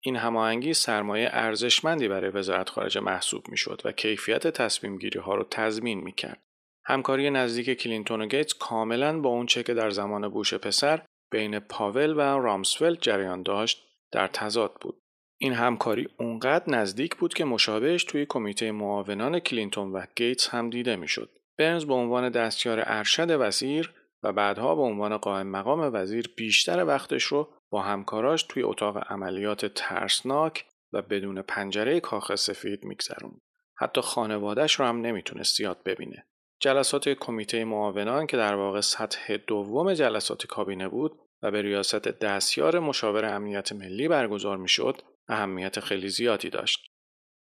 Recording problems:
thin; somewhat; fading below 350 Hz

